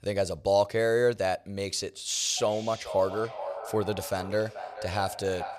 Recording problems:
echo of what is said; strong; from 2.5 s on; 430 ms later, 10 dB below the speech

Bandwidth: 14.5 kHz